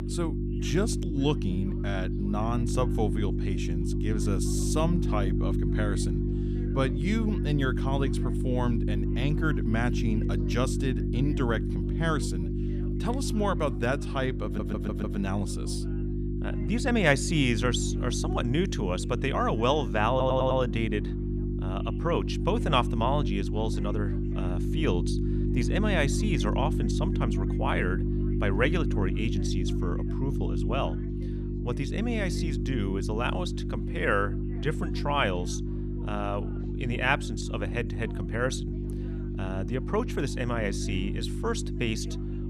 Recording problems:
electrical hum; loud; throughout; 50 Hz, 7 dB below the speech
chatter from many people; faint; throughout; 25 dB below the speech
audio stuttering; at 14 s and at 20 s

